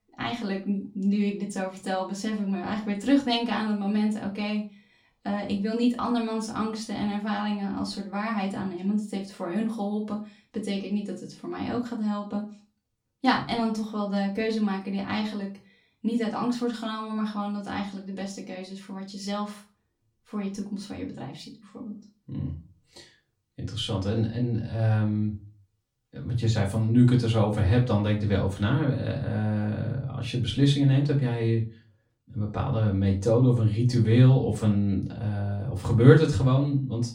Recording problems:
off-mic speech; far
room echo; very slight; dies away in 0.3 s

